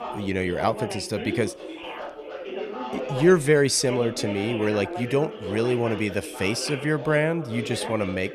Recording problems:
background chatter; loud; throughout; 3 voices, 10 dB below the speech

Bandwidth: 14.5 kHz